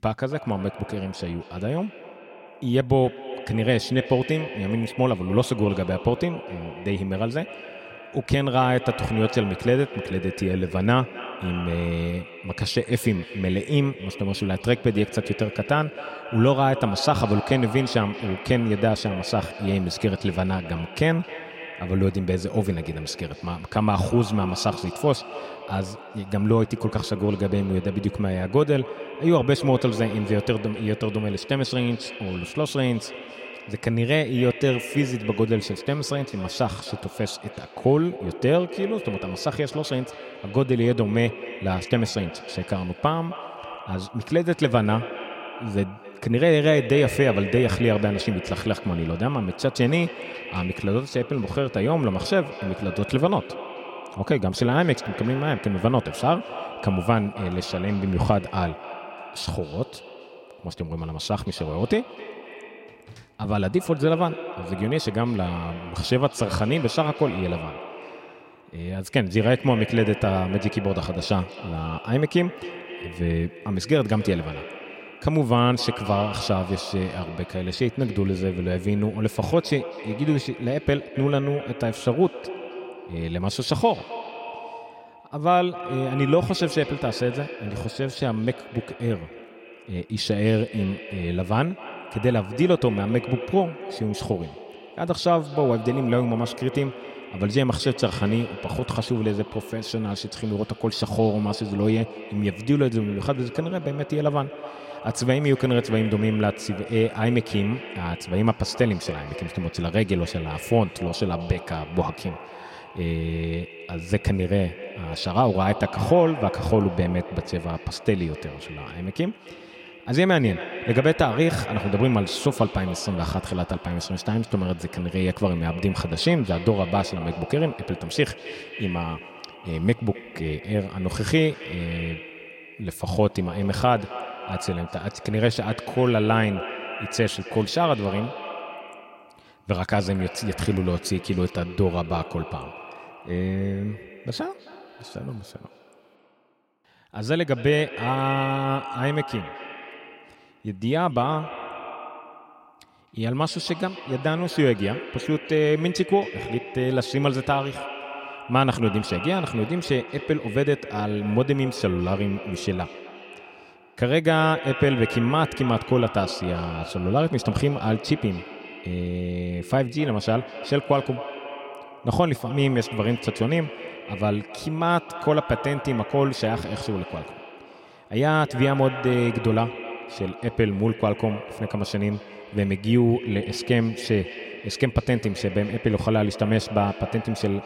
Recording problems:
echo of what is said; noticeable; throughout; 260 ms later, 10 dB below the speech

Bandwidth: 16 kHz